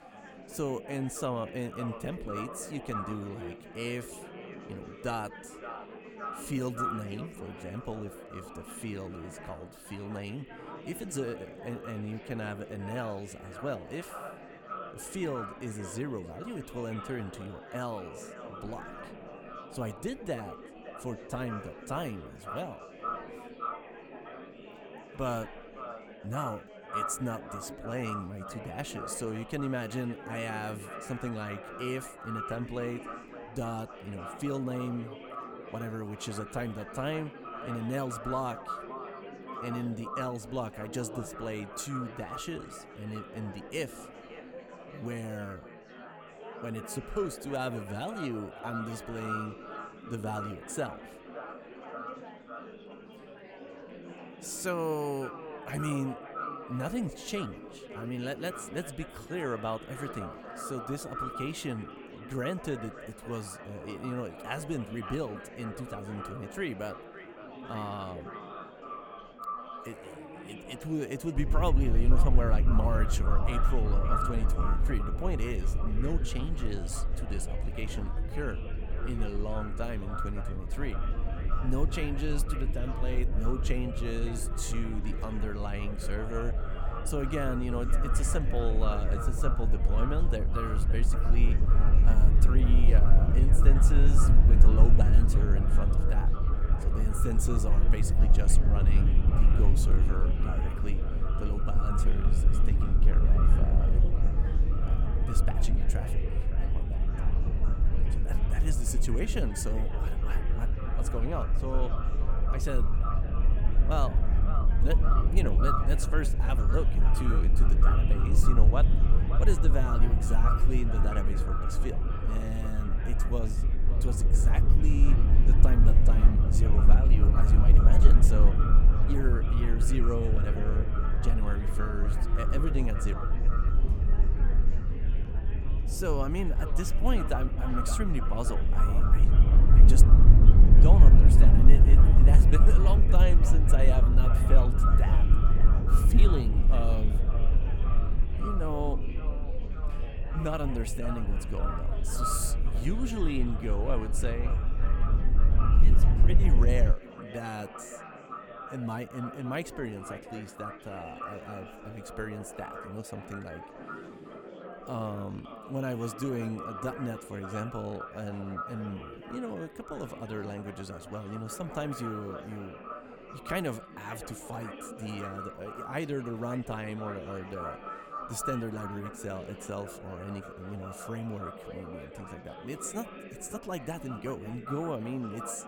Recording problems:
echo of what is said; strong; throughout; 560 ms later, 7 dB below the speech
chatter from many people; loud; throughout; 10 dB below the speech
low rumble; loud; from 1:11 to 2:37; 5 dB below the speech

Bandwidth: 17.5 kHz